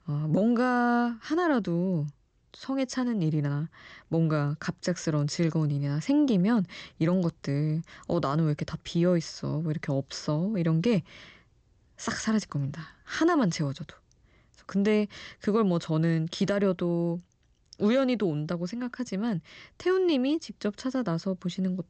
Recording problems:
high frequencies cut off; noticeable; nothing above 8 kHz

